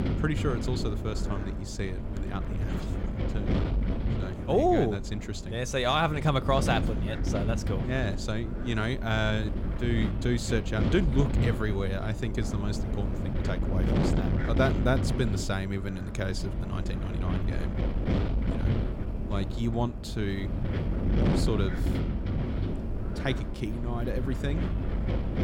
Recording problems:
wind noise on the microphone; heavy; 6 dB below the speech

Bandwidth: 16 kHz